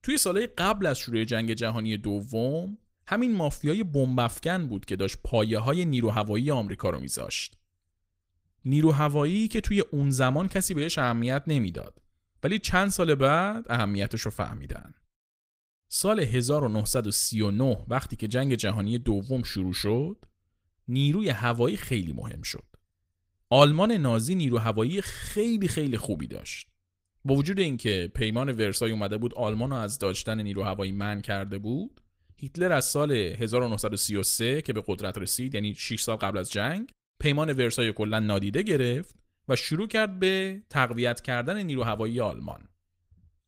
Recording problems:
garbled, watery; slightly; nothing above 15.5 kHz

